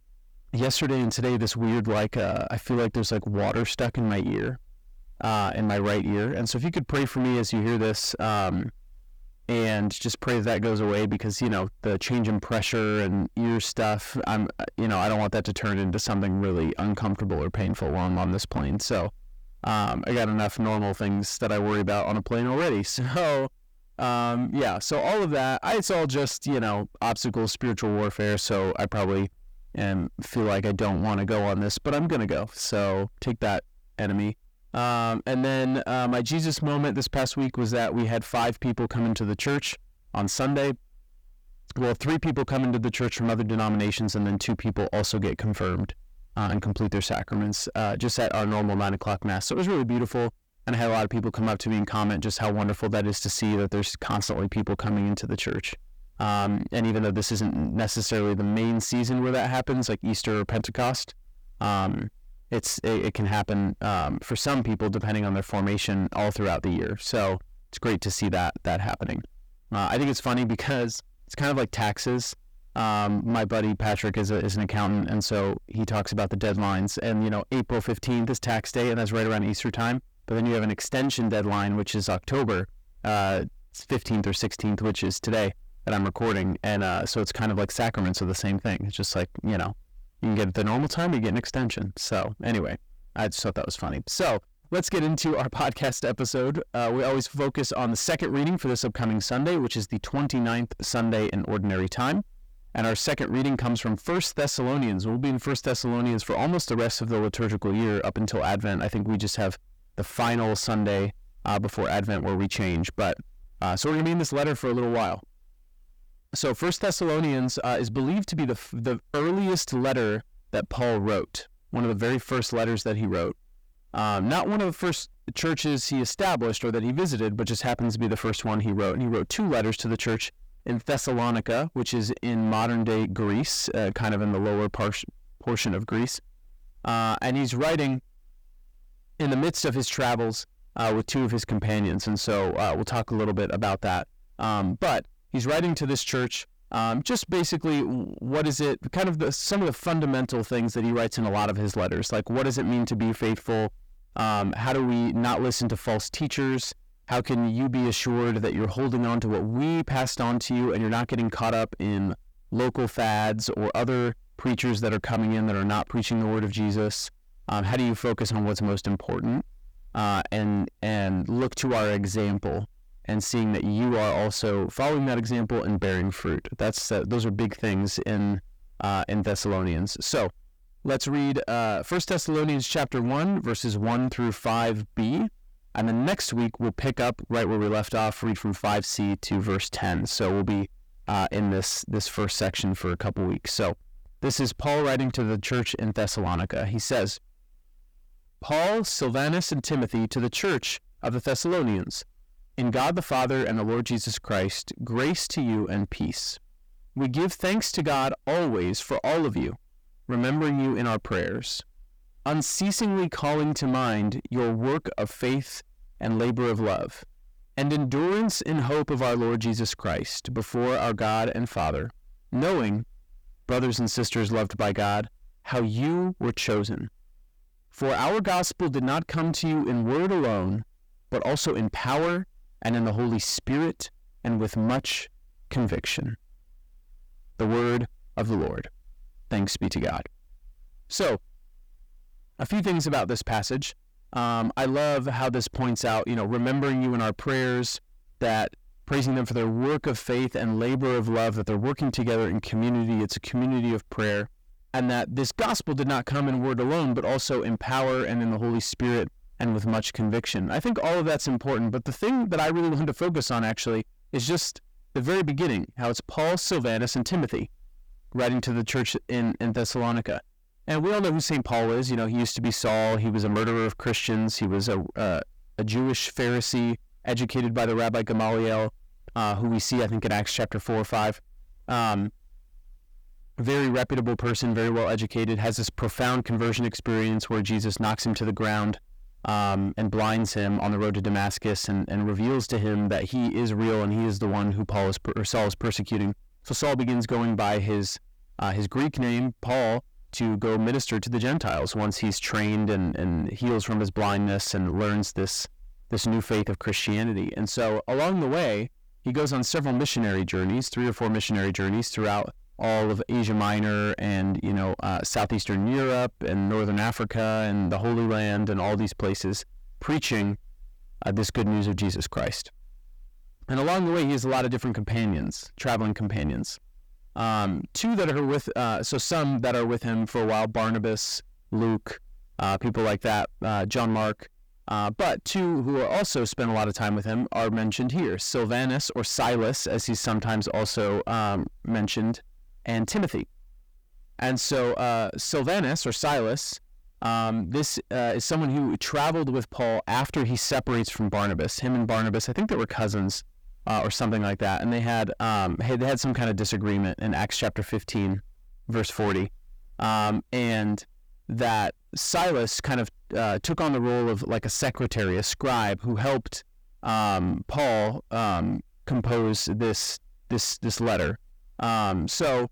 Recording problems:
distortion; heavy; 6 dB below the speech

